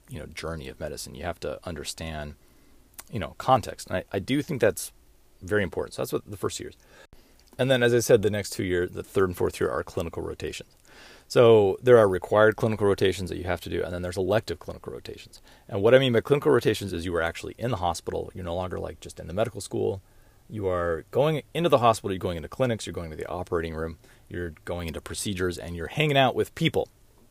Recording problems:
none

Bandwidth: 15 kHz